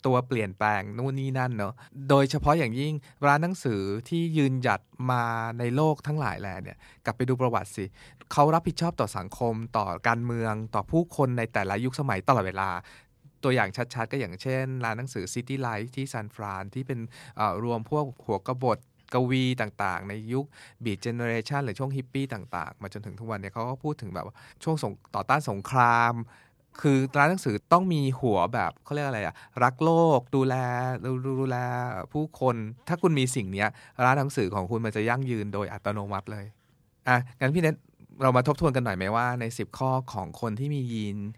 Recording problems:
none

